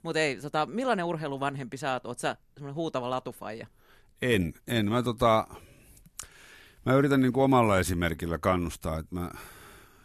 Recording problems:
none

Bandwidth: 13.5 kHz